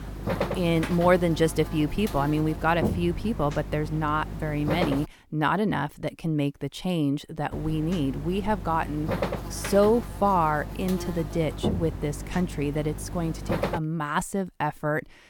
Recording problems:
electrical hum; loud; until 5 s and from 7.5 to 14 s; 50 Hz, 9 dB below the speech

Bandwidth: 18.5 kHz